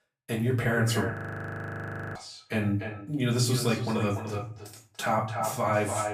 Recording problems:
echo of what is said; strong; throughout; 290 ms later, 8 dB below the speech
off-mic speech; far
room echo; slight; dies away in 0.3 s
audio freezing; at 1 s for 1 s

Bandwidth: 15 kHz